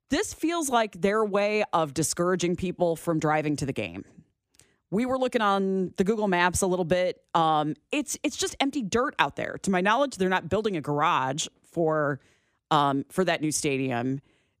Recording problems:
none

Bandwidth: 15 kHz